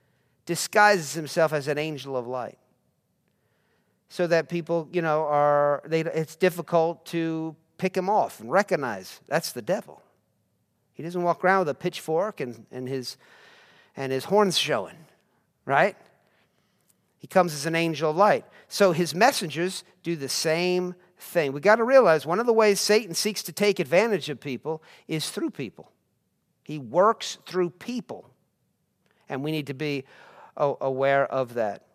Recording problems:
none

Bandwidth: 14.5 kHz